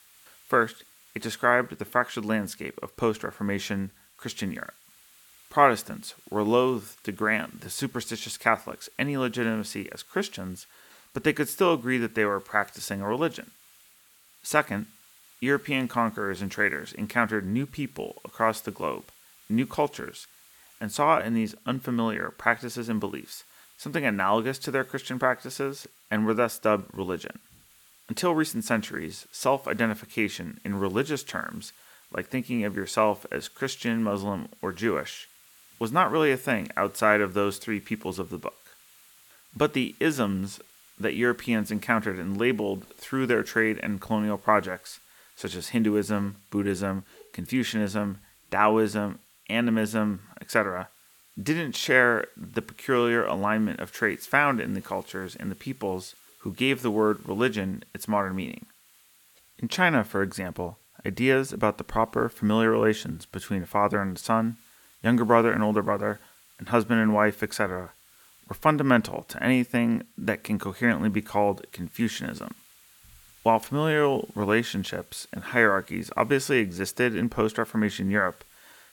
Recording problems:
hiss; faint; throughout; 25 dB below the speech

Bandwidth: 18 kHz